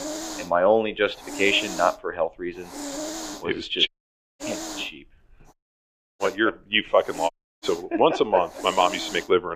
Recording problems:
muffled; very; fading above 3 kHz
thin; somewhat; fading below 450 Hz
hiss; noticeable; throughout; 10 dB below the speech
audio cutting out; at 4 s for 0.5 s, at 5.5 s for 0.5 s and at 7.5 s
abrupt cut into speech; at the end

